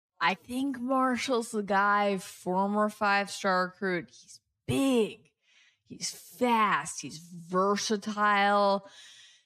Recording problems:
wrong speed, natural pitch; too slow; 0.6 times normal speed

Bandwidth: 14.5 kHz